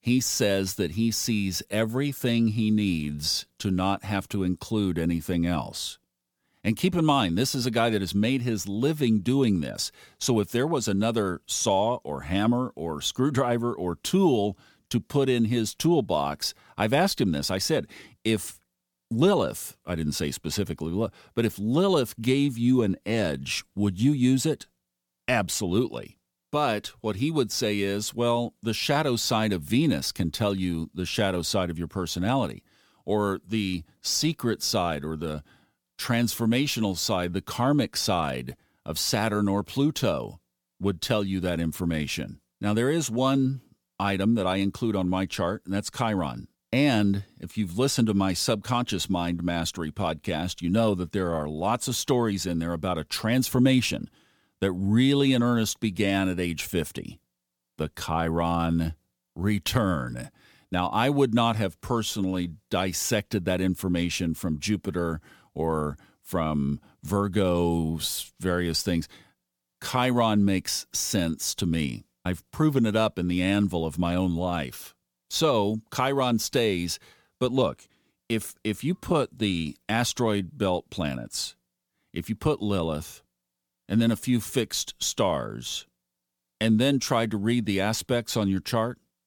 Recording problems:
none

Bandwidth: 18.5 kHz